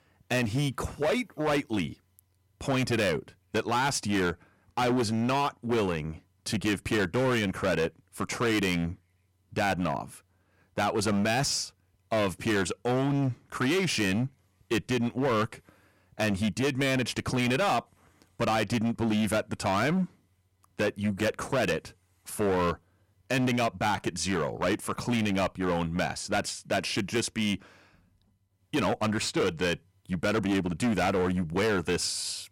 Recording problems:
distortion; heavy; 14% of the sound clipped

